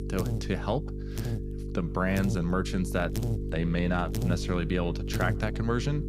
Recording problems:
electrical hum; loud; throughout; 50 Hz, 9 dB below the speech

